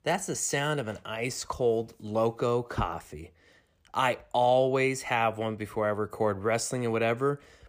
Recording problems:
none

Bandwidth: 15 kHz